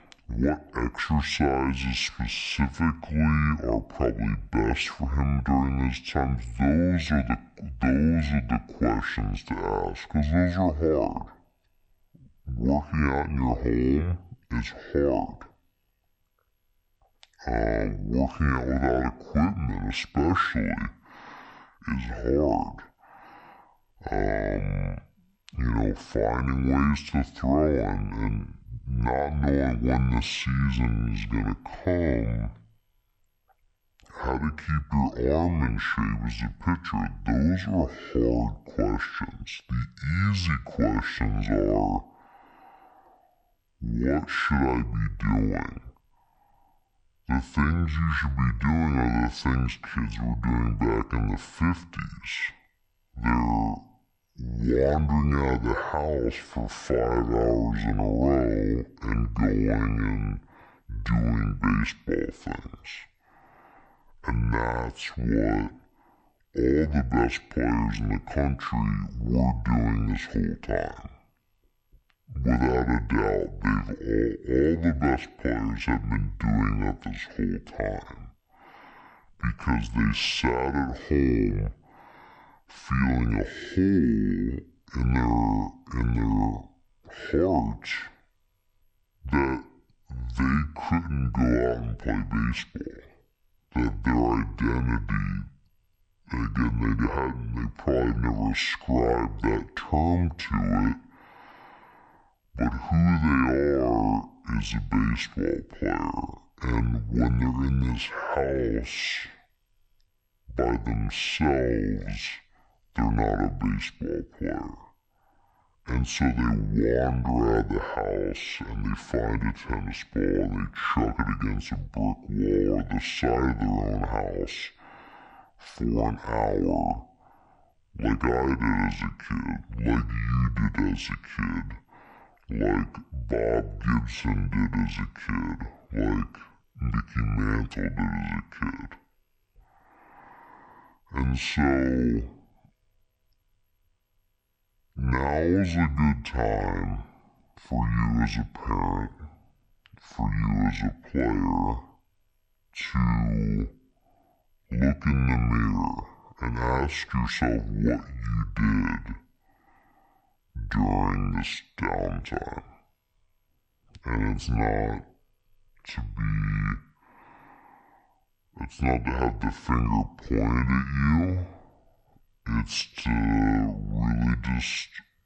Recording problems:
wrong speed and pitch; too slow and too low; 0.6 times normal speed

